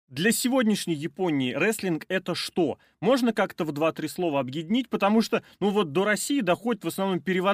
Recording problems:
abrupt cut into speech; at the end

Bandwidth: 15 kHz